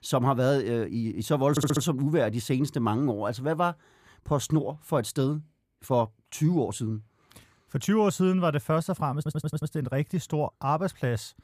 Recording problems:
audio stuttering; at 1.5 s and at 9 s

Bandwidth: 15 kHz